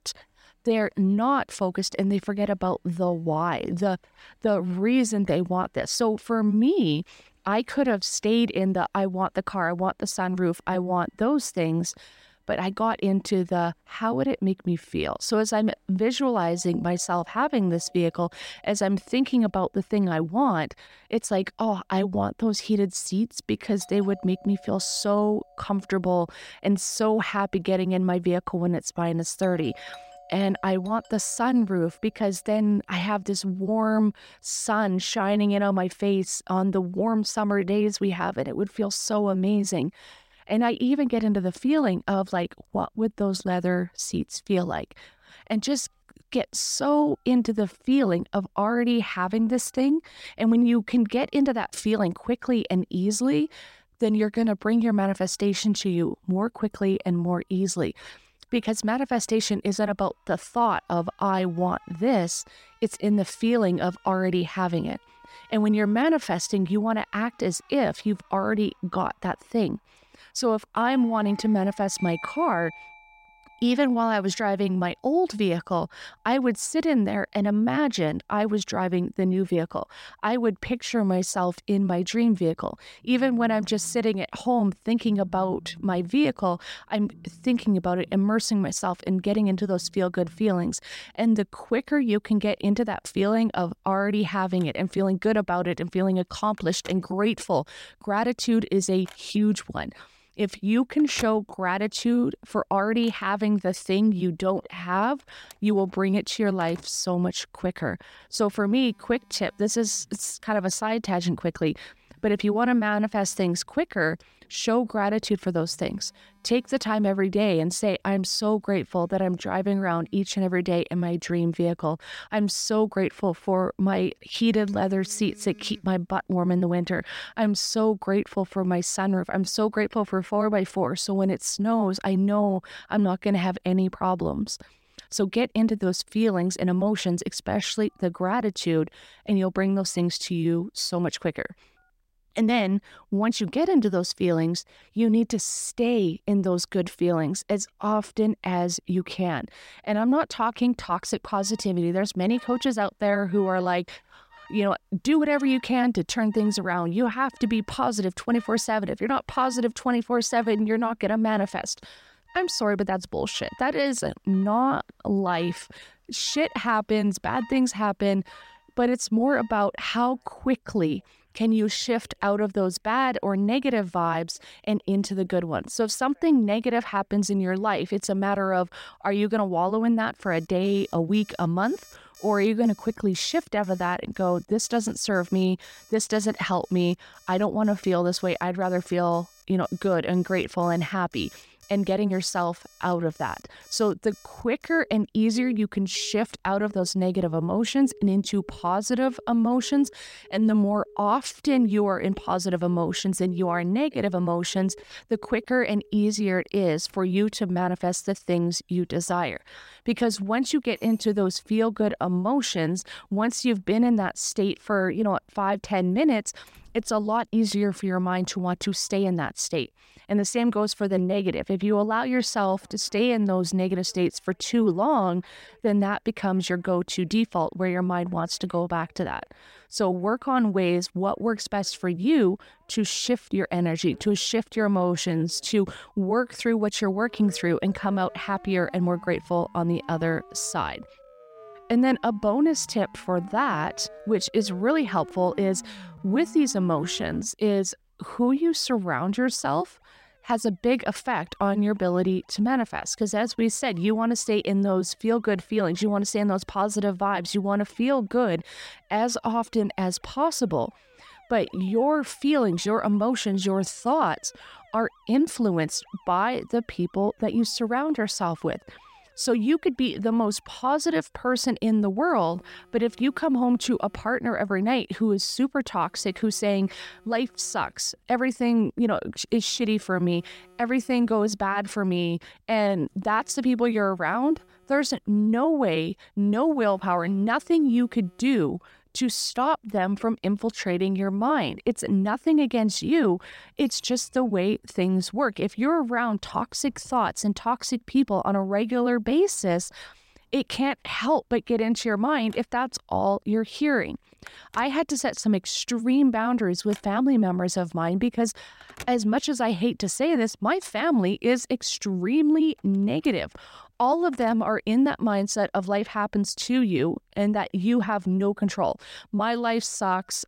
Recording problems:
alarms or sirens; faint; throughout; 25 dB below the speech

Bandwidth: 16 kHz